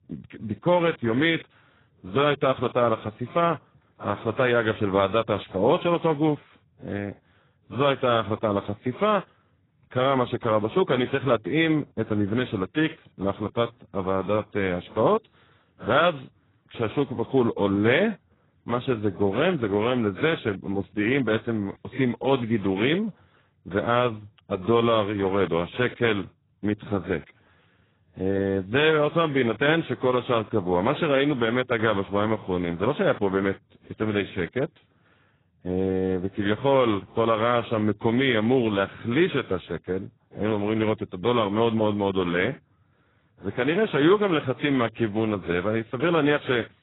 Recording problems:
garbled, watery; badly; nothing above 3.5 kHz

